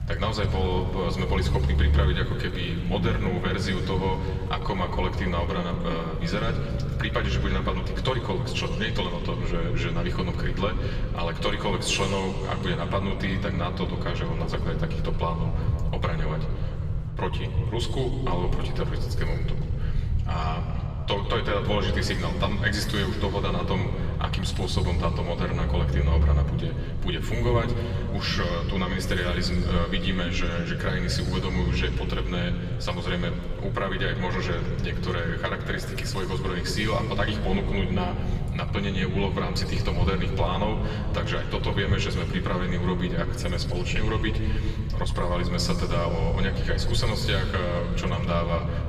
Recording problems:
off-mic speech; far
room echo; noticeable; dies away in 2.3 s
low rumble; noticeable; throughout; 15 dB below the speech
murmuring crowd; faint; throughout; 25 dB below the speech

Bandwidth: 15 kHz